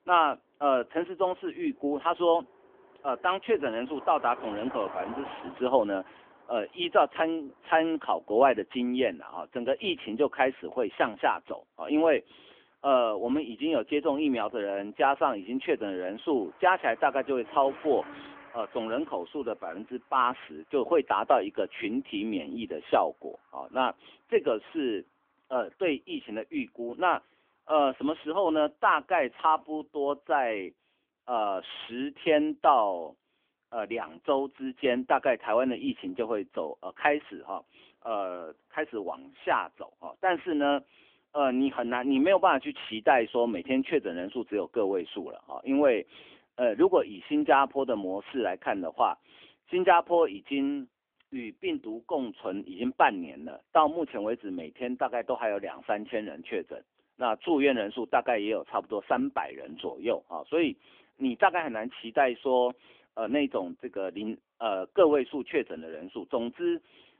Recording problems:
phone-call audio; nothing above 3.5 kHz
traffic noise; faint; throughout; 20 dB below the speech

